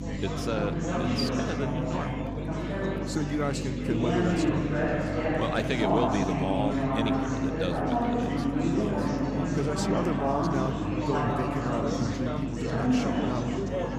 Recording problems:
chatter from many people; very loud; throughout; 3 dB above the speech
electrical hum; noticeable; throughout; 50 Hz, 10 dB below the speech
household noises; faint; throughout; 25 dB below the speech

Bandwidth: 15.5 kHz